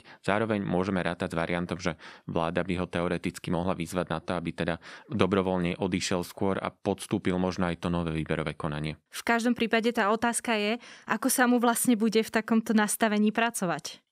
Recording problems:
none

